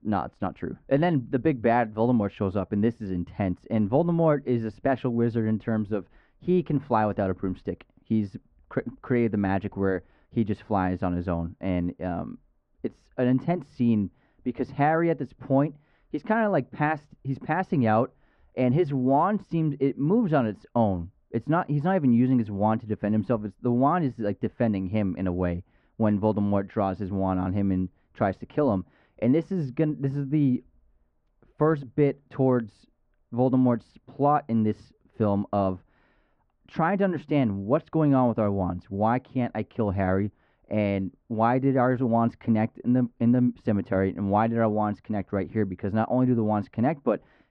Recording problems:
muffled; very; fading above 1.5 kHz

